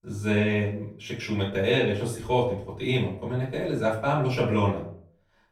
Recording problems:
off-mic speech; far
room echo; slight; dies away in 0.4 s

